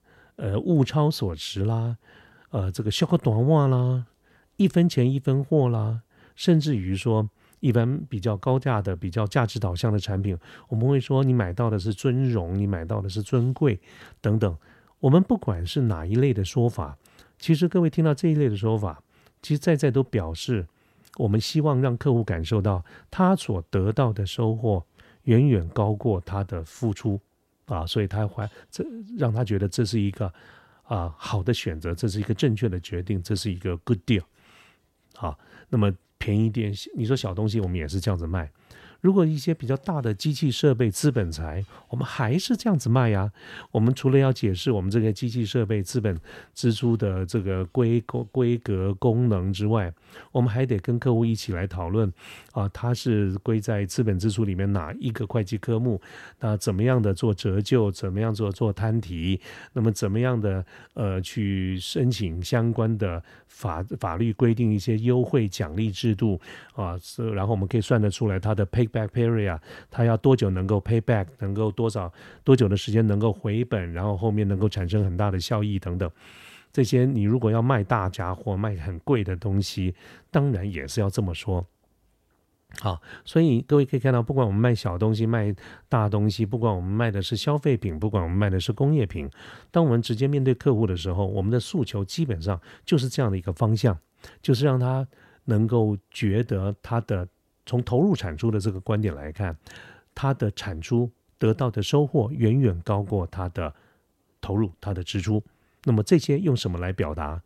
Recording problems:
none

